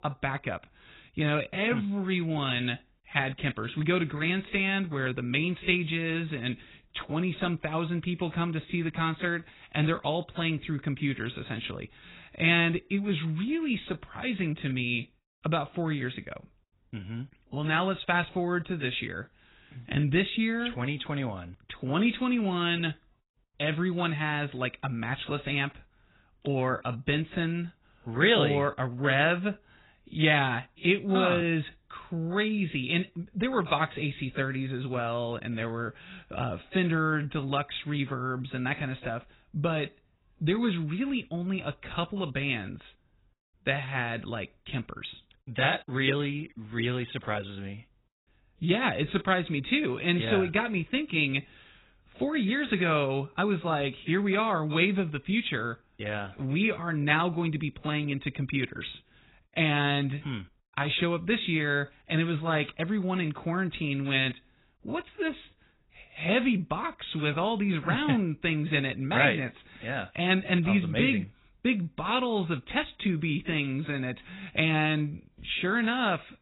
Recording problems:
garbled, watery; badly; nothing above 4 kHz
uneven, jittery; slightly; from 26 s to 1:06

